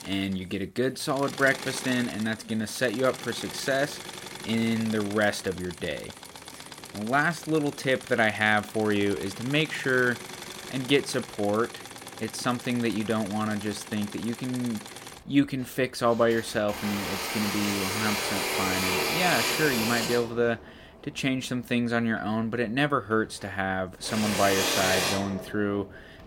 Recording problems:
machinery noise; loud; throughout; 5 dB below the speech

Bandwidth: 16.5 kHz